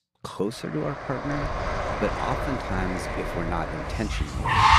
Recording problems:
traffic noise; very loud; from 1 s on; 2 dB above the speech

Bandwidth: 14.5 kHz